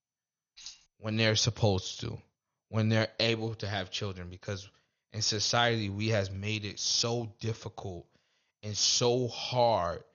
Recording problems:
garbled, watery; slightly; nothing above 6.5 kHz
jangling keys; faint; at 0.5 s; peak 15 dB below the speech

